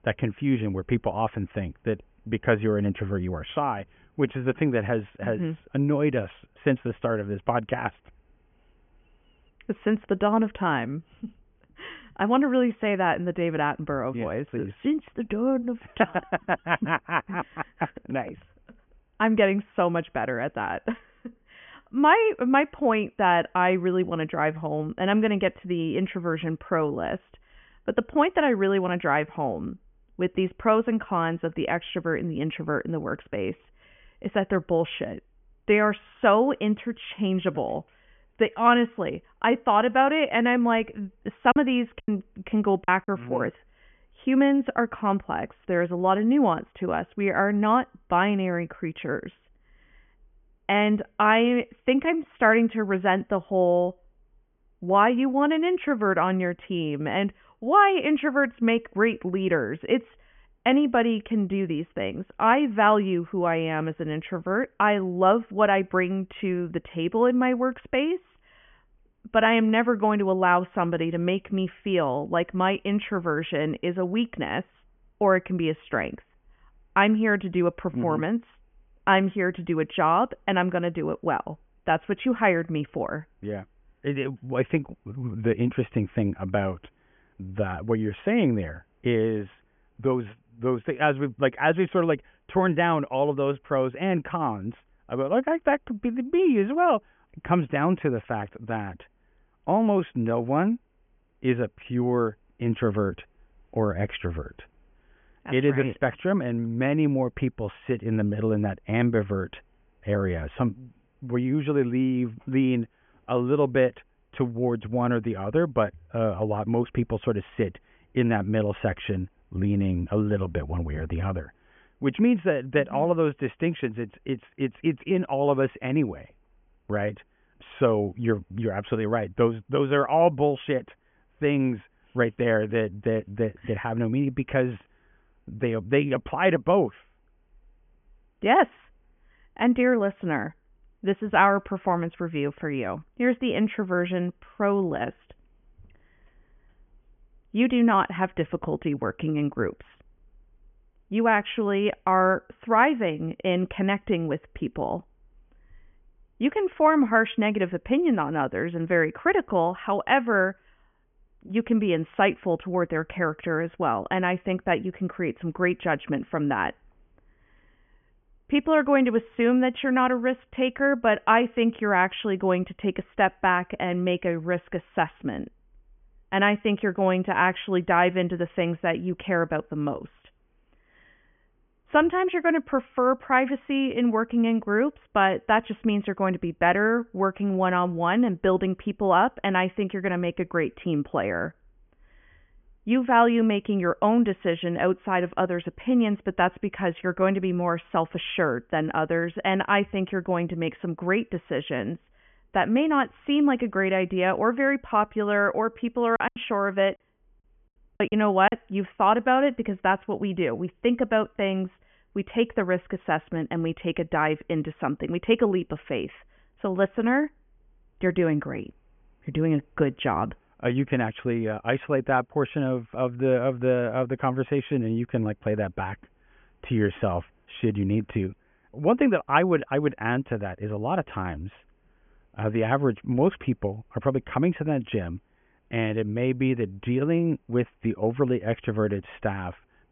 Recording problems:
high frequencies cut off; severe; nothing above 3.5 kHz
choppy; very; from 42 to 43 s and from 3:26 to 3:29; 13% of the speech affected

